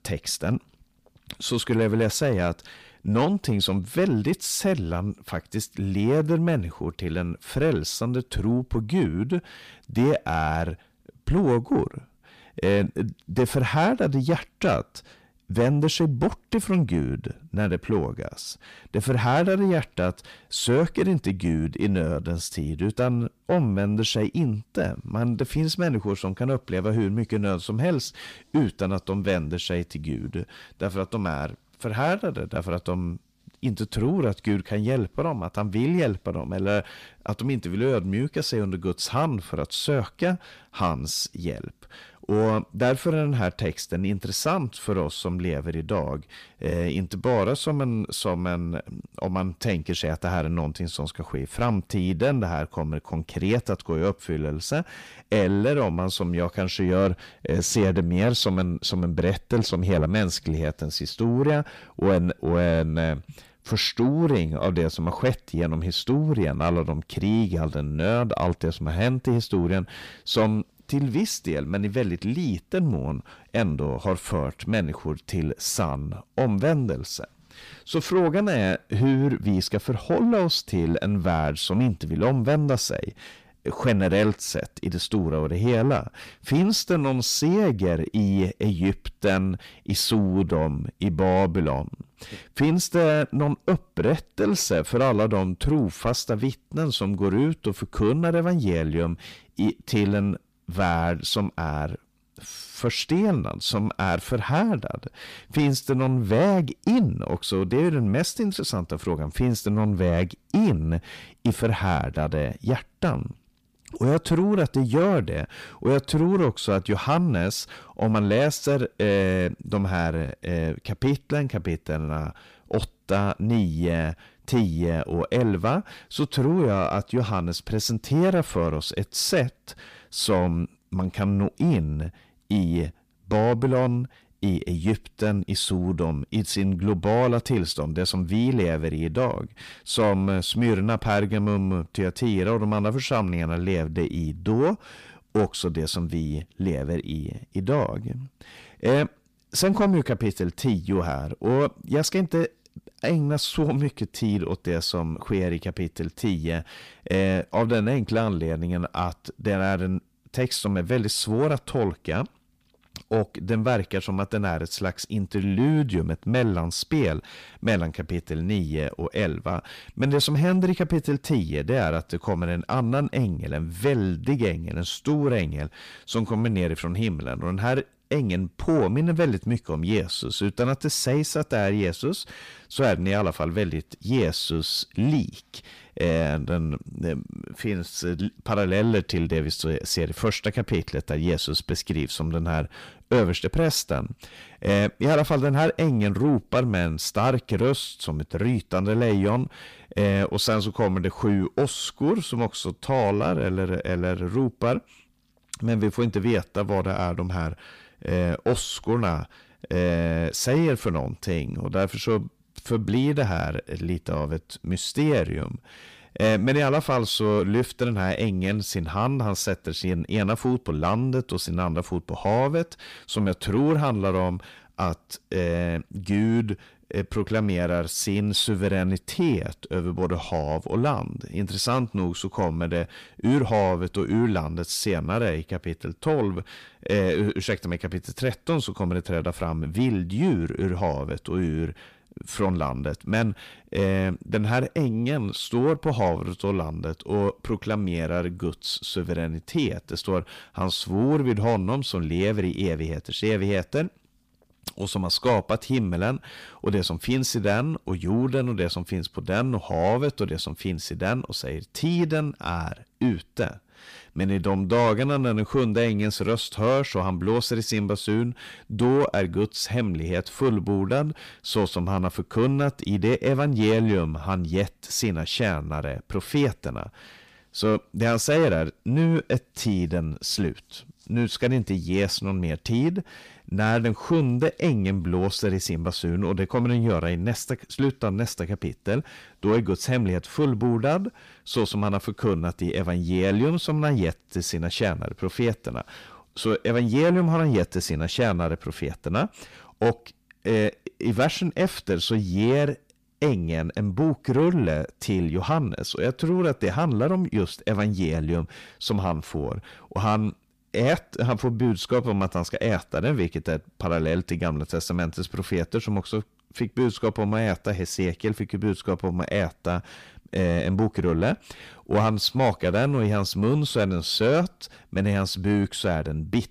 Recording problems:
distortion; slight; 10 dB below the speech

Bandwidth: 15 kHz